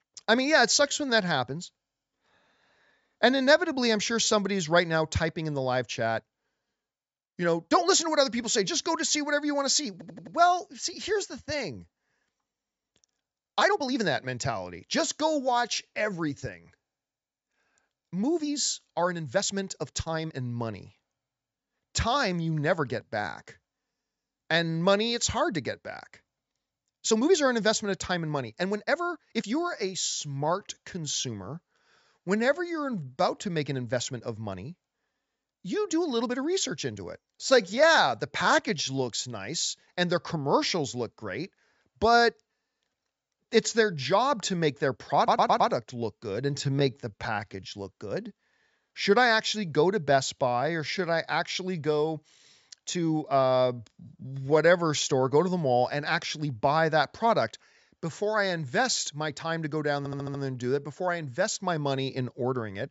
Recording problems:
high frequencies cut off; noticeable; nothing above 8 kHz
uneven, jittery; strongly; from 1 s to 1:00
audio stuttering; at 10 s, at 45 s and at 1:00

